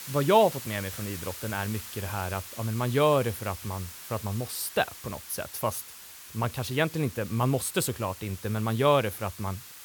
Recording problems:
hiss; noticeable; throughout; 10 dB below the speech

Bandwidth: 18.5 kHz